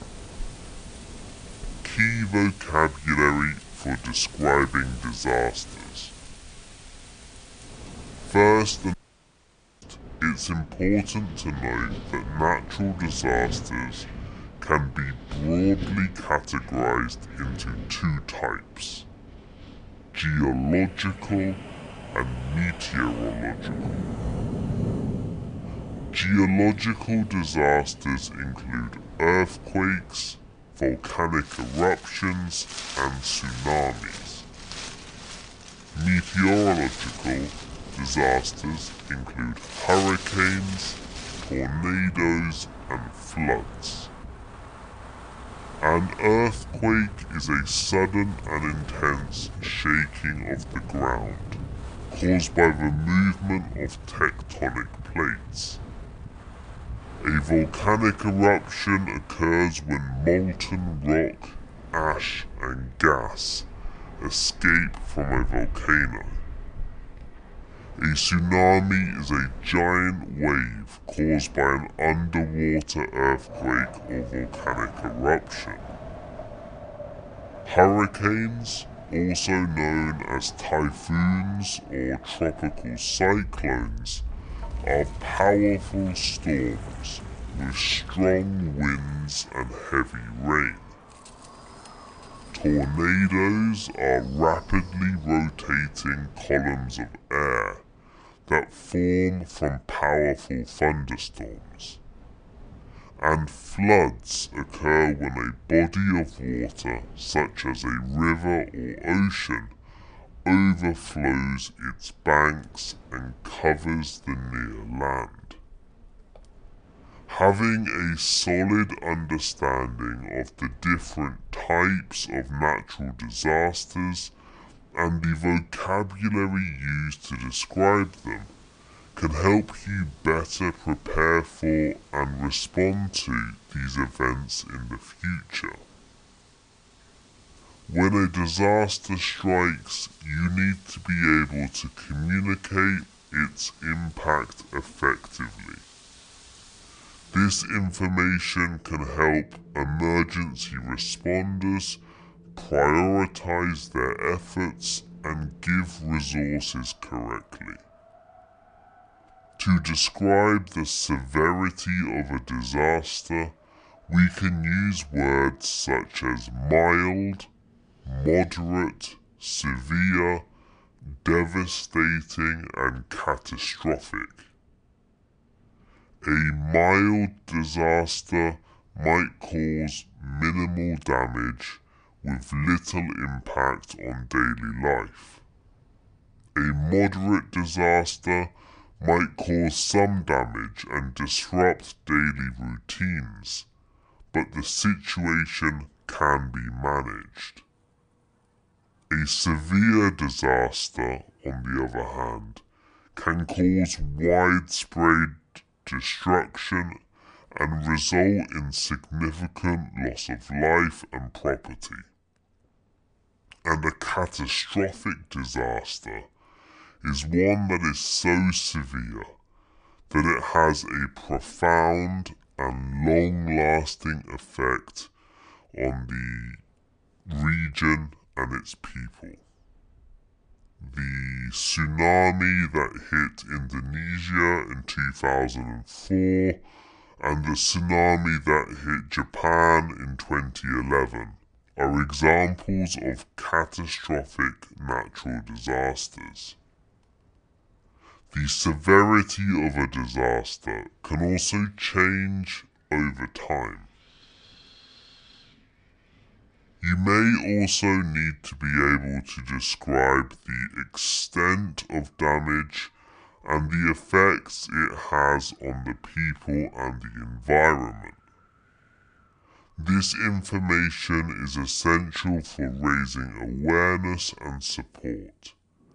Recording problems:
wrong speed and pitch; too slow and too low; 0.7 times normal speed
wind in the background; noticeable; throughout; 15 dB below the speech
audio cutting out; at 9 s for 1 s

